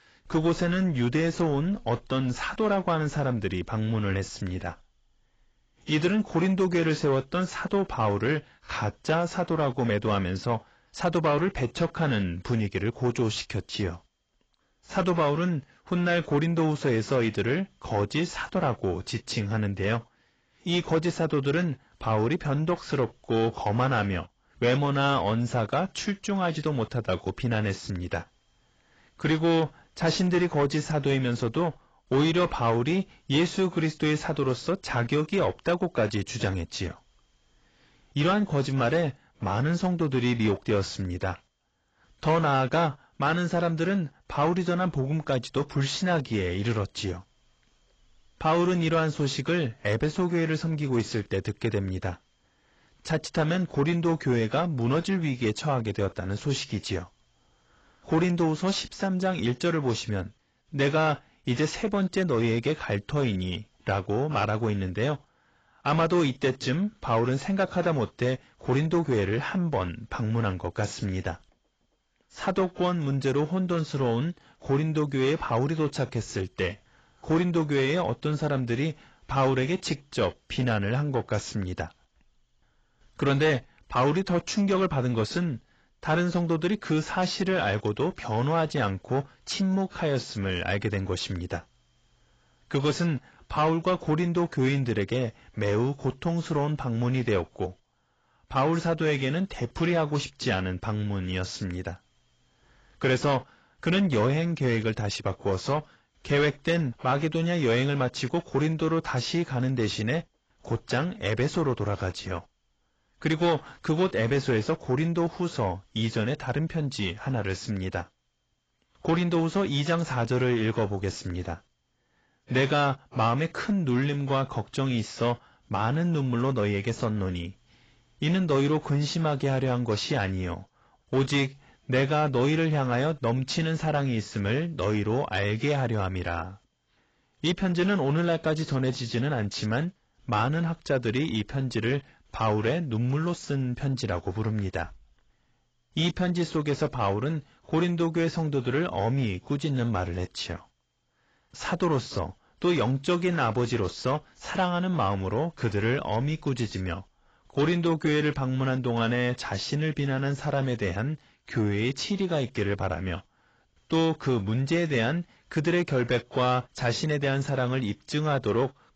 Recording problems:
garbled, watery; badly; nothing above 7.5 kHz
distortion; slight; 10 dB below the speech

